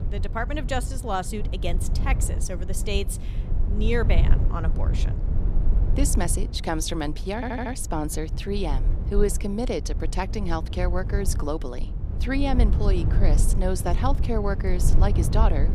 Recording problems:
low rumble; noticeable; throughout; 10 dB below the speech
audio stuttering; at 7.5 s

